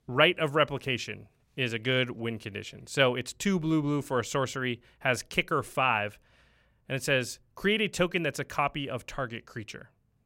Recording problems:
none

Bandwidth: 16 kHz